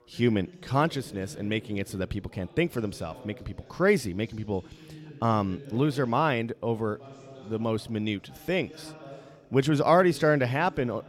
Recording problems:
background chatter; noticeable; throughout; 3 voices, 20 dB below the speech

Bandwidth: 16.5 kHz